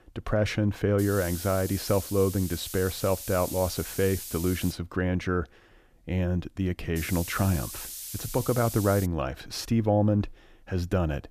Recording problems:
hiss; loud; from 1 to 4.5 s and from 7 to 9 s; 9 dB below the speech

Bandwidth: 14.5 kHz